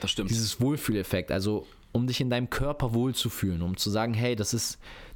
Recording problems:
squashed, flat; heavily

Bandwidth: 17 kHz